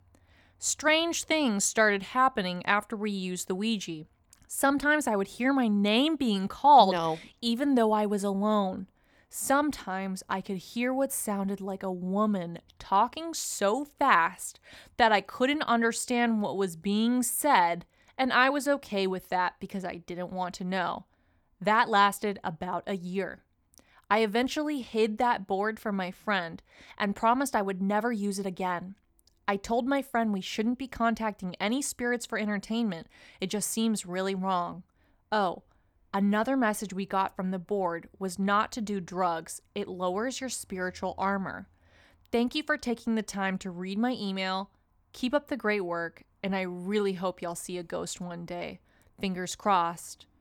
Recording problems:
none

